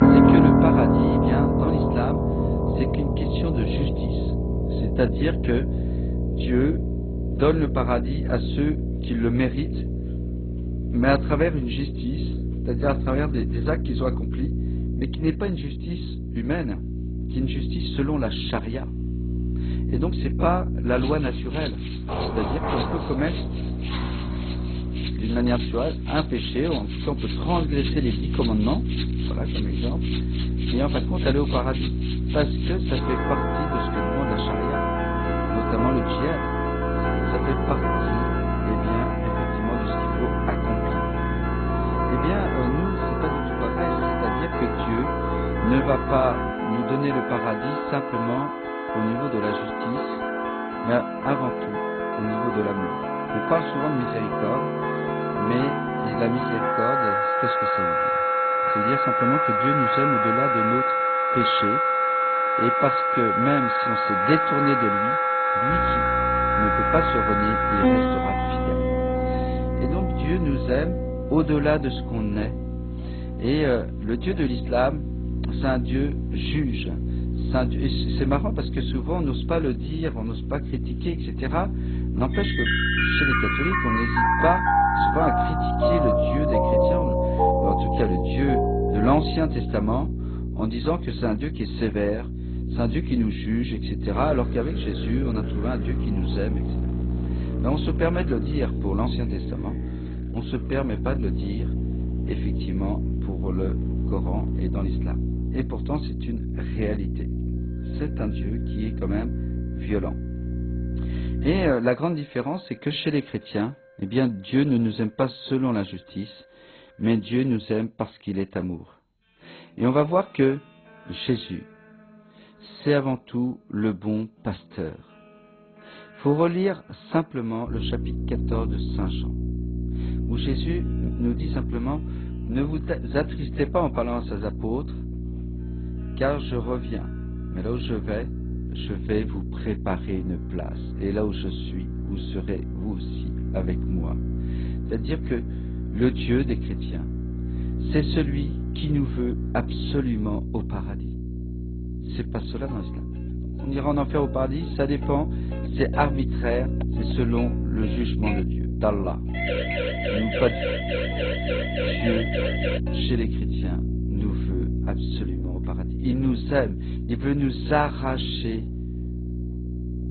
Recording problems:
garbled, watery; badly; nothing above 4 kHz
background music; very loud; throughout; 3 dB above the speech
electrical hum; loud; until 47 s, from 1:06 to 1:52 and from 2:08 on; 60 Hz, 10 dB below the speech
door banging; noticeable; from 22 to 25 s; peak 1 dB below the speech
siren; loud; from 2:39 to 2:43; peak 1 dB above the speech

